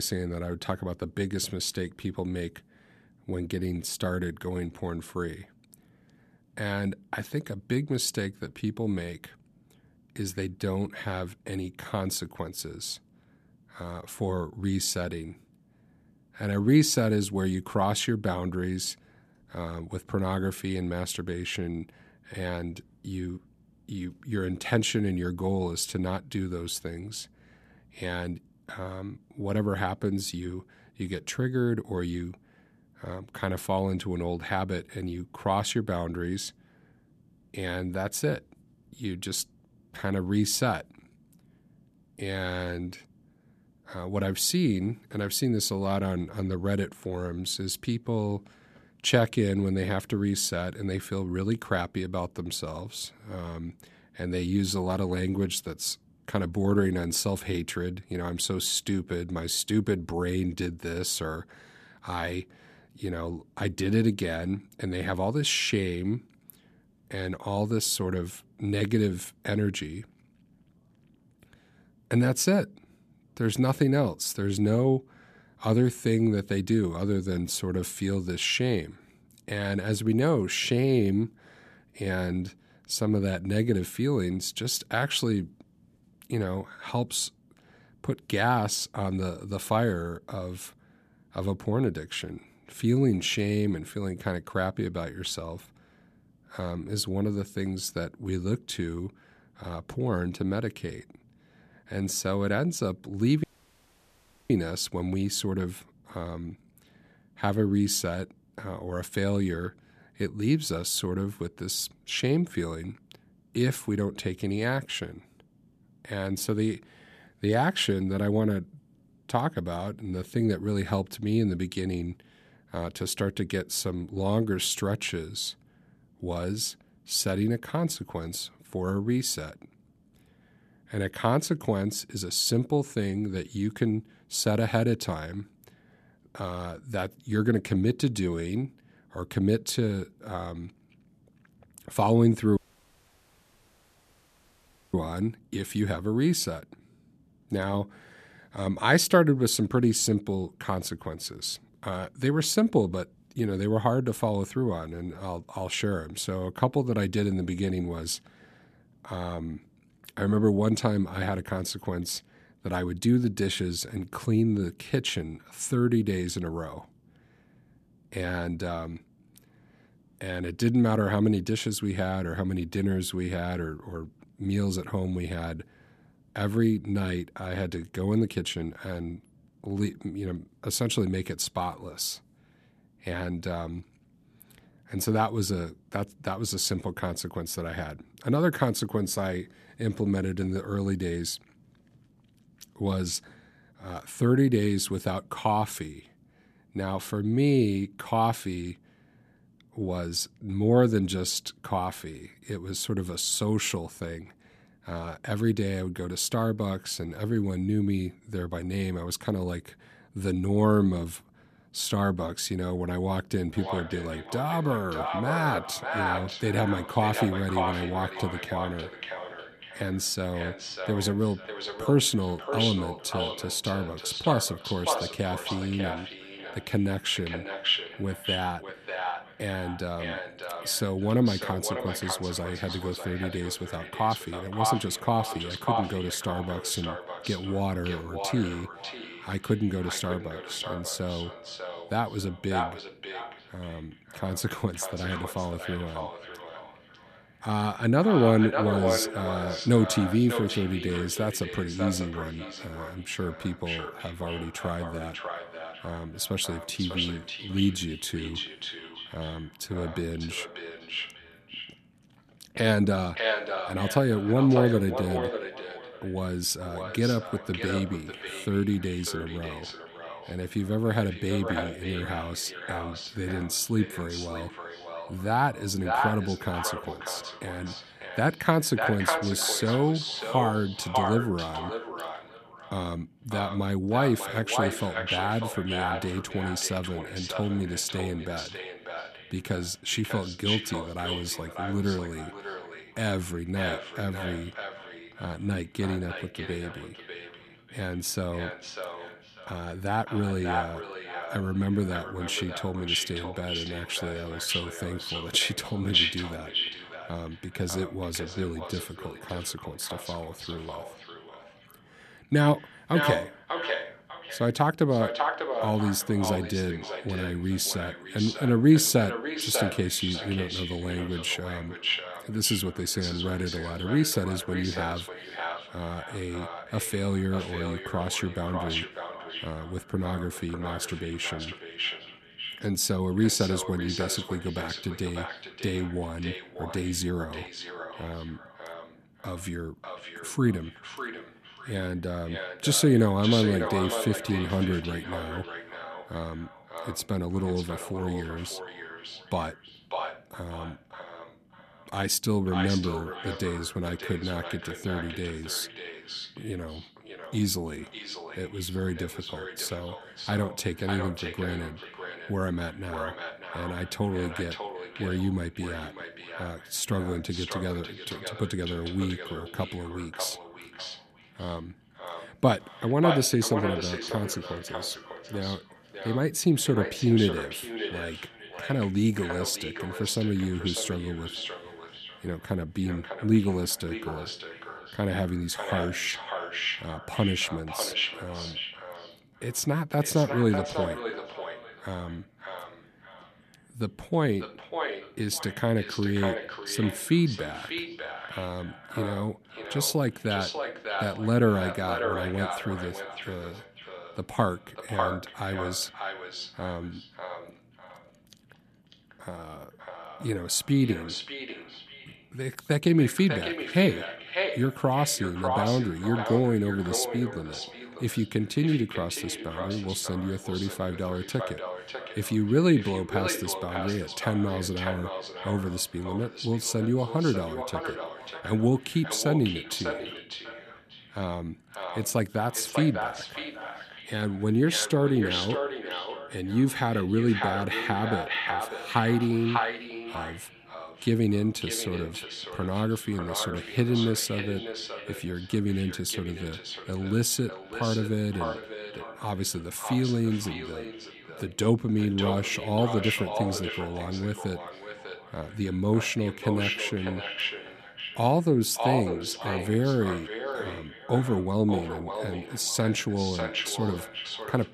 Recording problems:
echo of what is said; strong; from 3:34 on; 600 ms later, 6 dB below the speech
abrupt cut into speech; at the start
audio cutting out; at 1:43 for 1 s and at 2:23 for 2.5 s

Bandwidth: 14 kHz